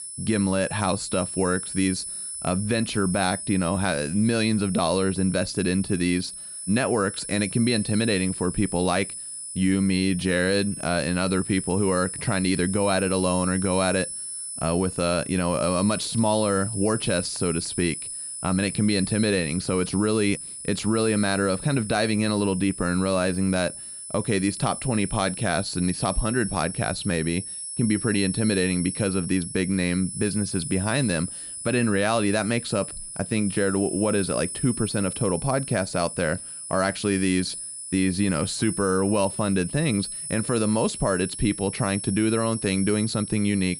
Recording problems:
high-pitched whine; loud; throughout; 10 kHz, 8 dB below the speech

